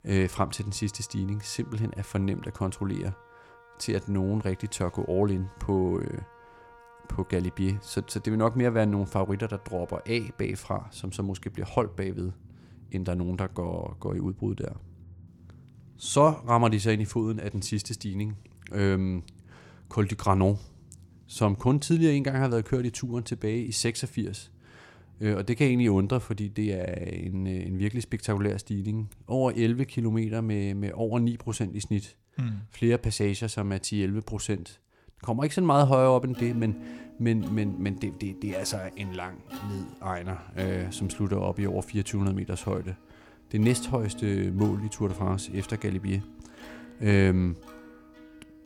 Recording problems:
background music; noticeable; throughout; 20 dB below the speech

